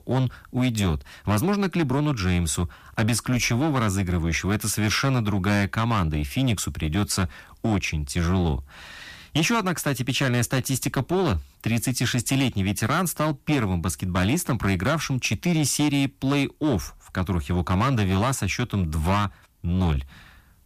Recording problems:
distortion; slight; 12% of the sound clipped

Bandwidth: 14.5 kHz